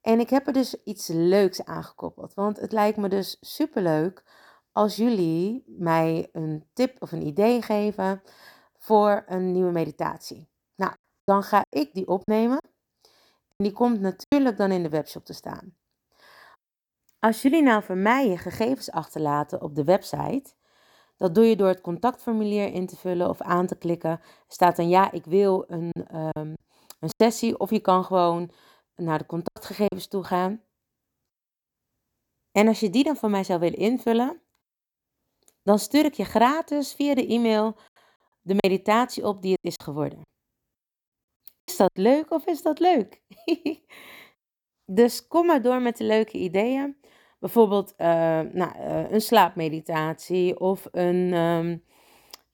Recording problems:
choppy; very; from 11 to 14 s, from 26 to 30 s and from 39 to 42 s; 11% of the speech affected

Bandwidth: 18.5 kHz